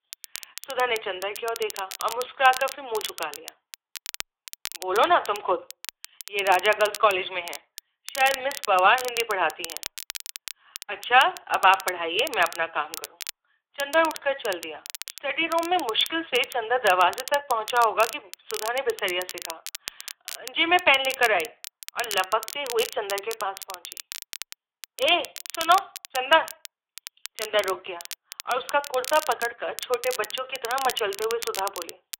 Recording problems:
thin; very; fading below 550 Hz
phone-call audio
crackle, like an old record; noticeable; 15 dB below the speech

